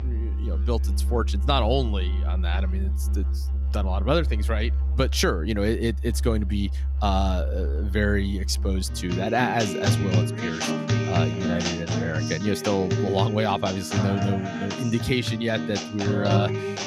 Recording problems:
background music; very loud; throughout; as loud as the speech

